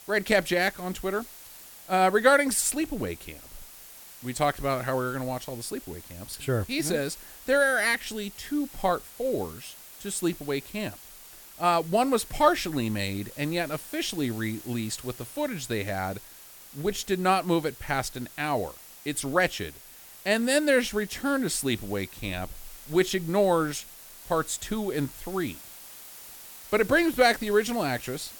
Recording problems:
hiss; noticeable; throughout; 15 dB below the speech

